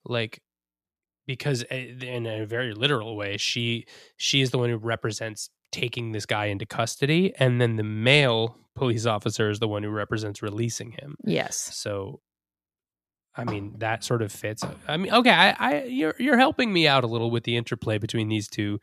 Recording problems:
none

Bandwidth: 14.5 kHz